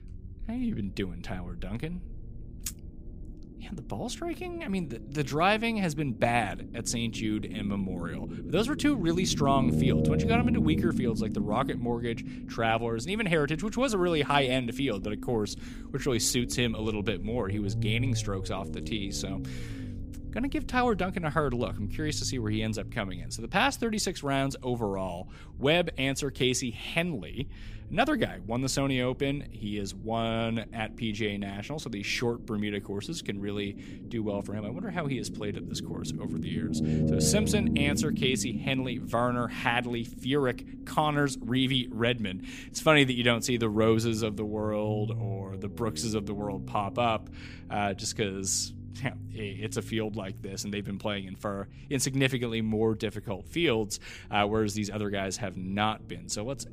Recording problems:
low rumble; noticeable; throughout; 10 dB below the speech

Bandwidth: 15 kHz